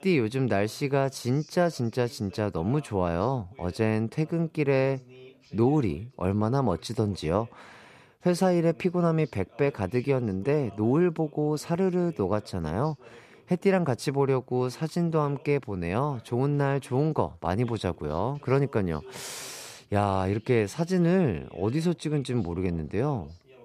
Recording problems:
voice in the background; faint; throughout; 25 dB below the speech

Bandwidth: 14.5 kHz